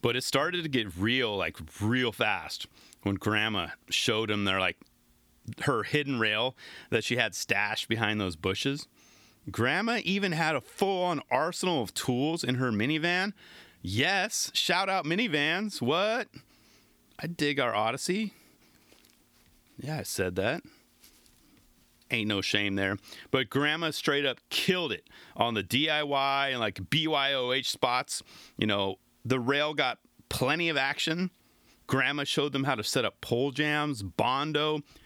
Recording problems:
squashed, flat; heavily

